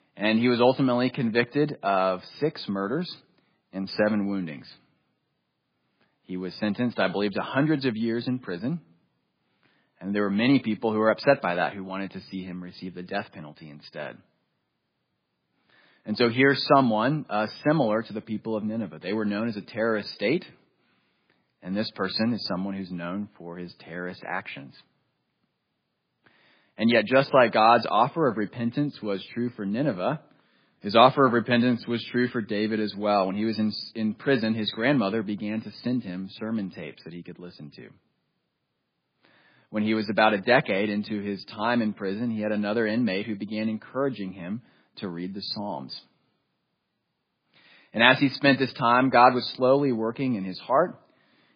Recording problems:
garbled, watery; badly; nothing above 4.5 kHz

